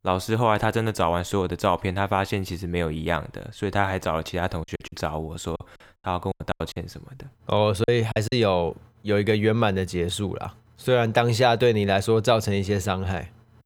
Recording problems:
choppy; very; from 4.5 to 8.5 s; 13% of the speech affected

